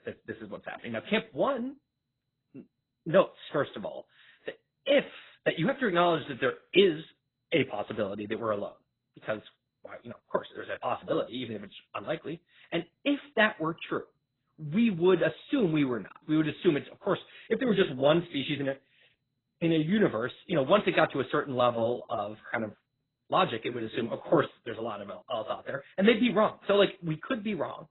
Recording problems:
garbled, watery; badly; nothing above 4 kHz
uneven, jittery; strongly; from 0.5 to 23 s

